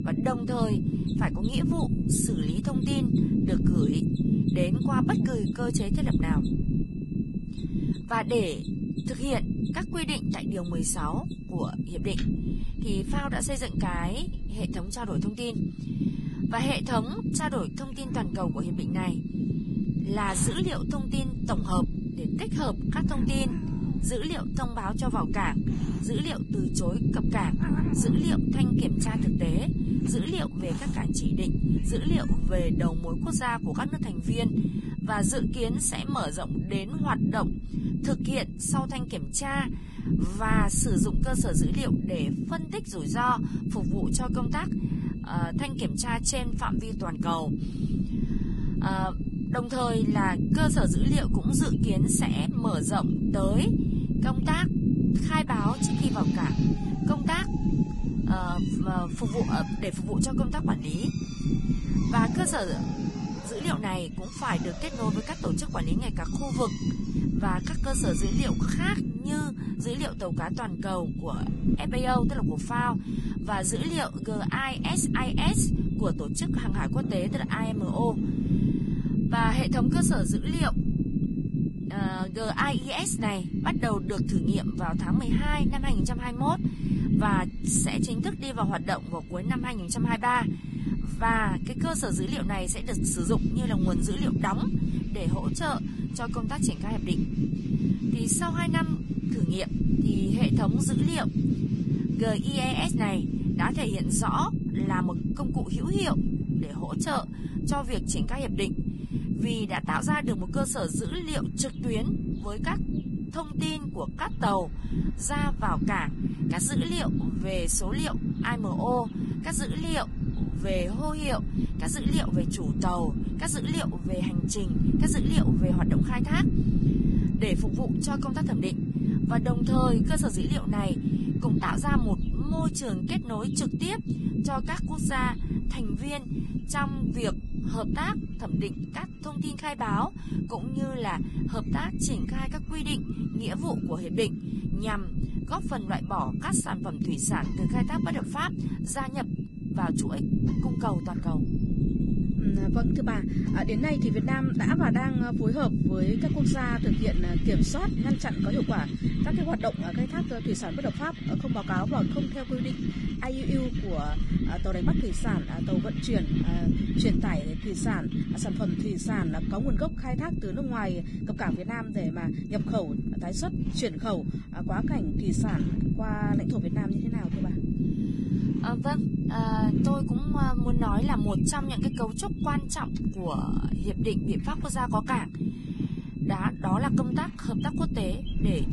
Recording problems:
garbled, watery; badly; nothing above 11 kHz
low rumble; loud; throughout; 4 dB below the speech
machinery noise; noticeable; throughout; 20 dB below the speech
high-pitched whine; faint; throughout; 2.5 kHz, 30 dB below the speech
animal sounds; faint; throughout; 25 dB below the speech

